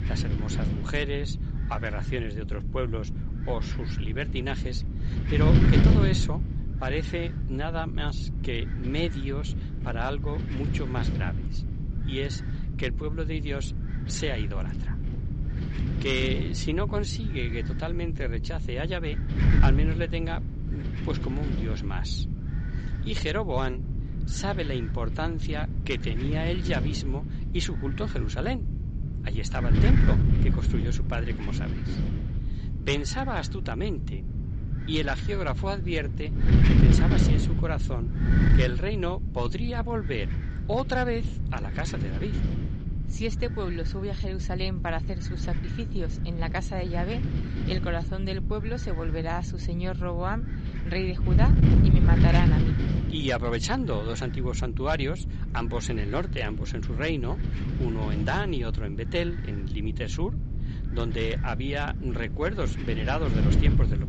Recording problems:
high frequencies cut off; noticeable; nothing above 8 kHz
wind noise on the microphone; heavy; 5 dB below the speech

